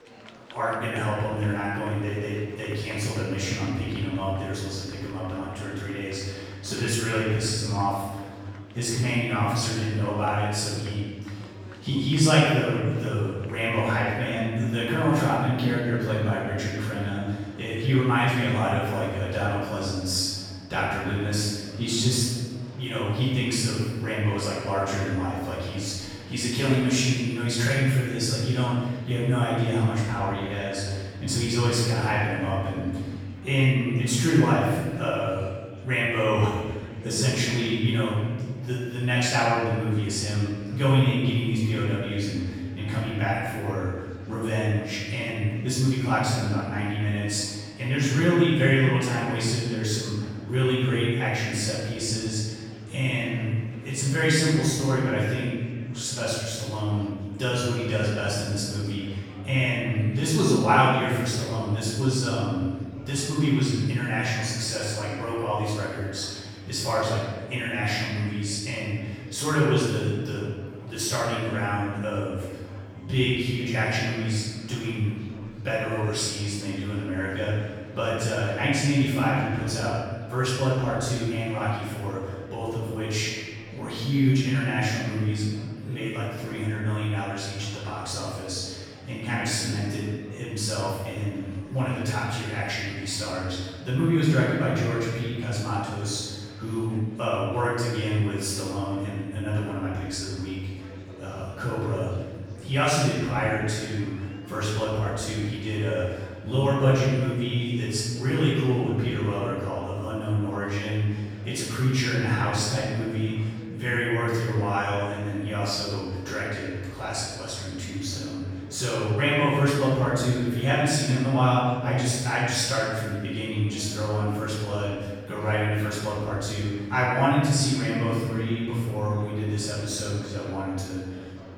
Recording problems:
room echo; strong; dies away in 1.6 s
off-mic speech; far
murmuring crowd; faint; throughout; 20 dB below the speech

